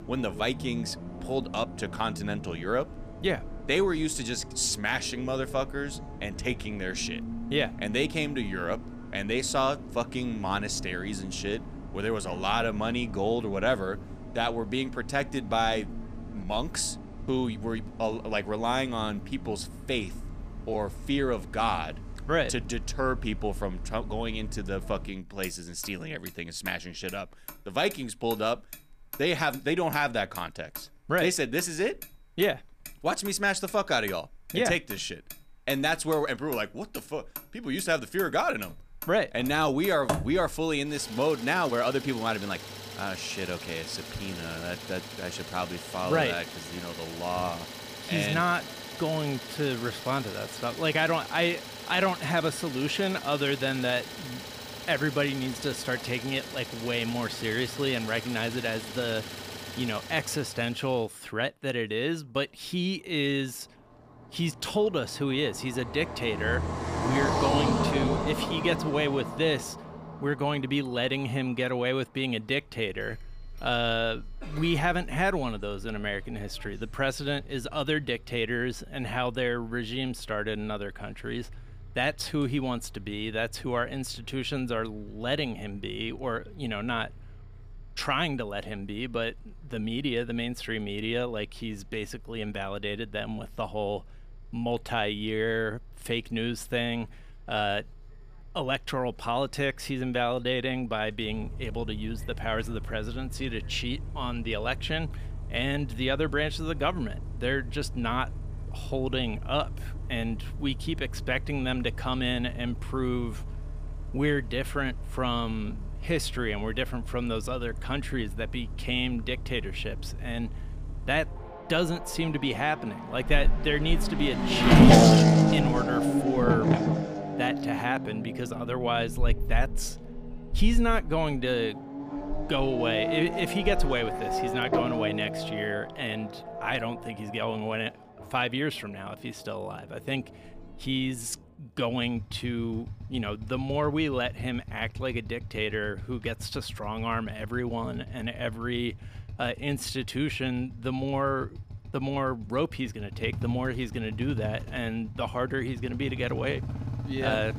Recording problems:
traffic noise; loud; throughout; 3 dB below the speech

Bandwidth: 15 kHz